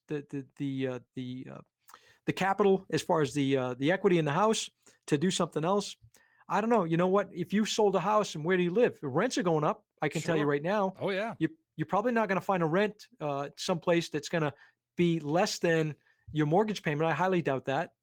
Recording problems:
garbled, watery; slightly; nothing above 18.5 kHz

